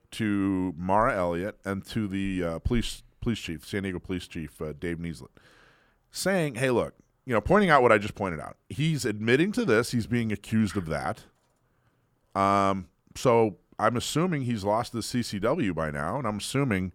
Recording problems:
none

